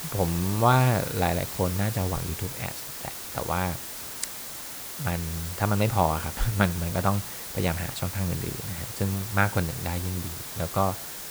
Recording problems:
hiss; loud; throughout; 6 dB below the speech

